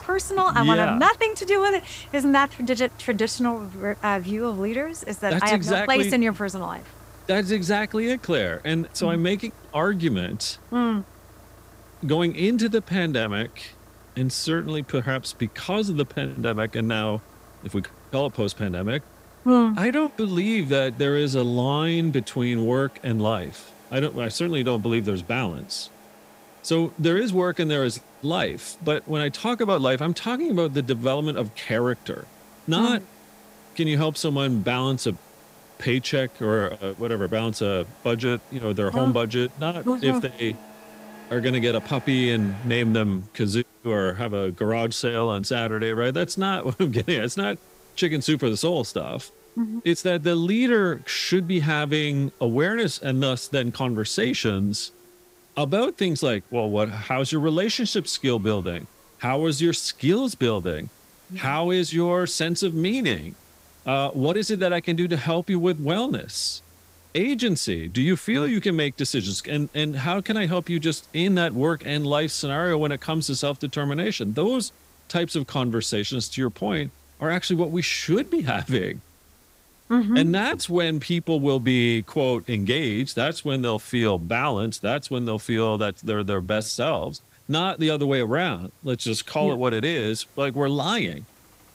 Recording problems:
traffic noise; faint; throughout; 25 dB below the speech
hiss; faint; throughout; 30 dB below the speech

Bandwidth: 15.5 kHz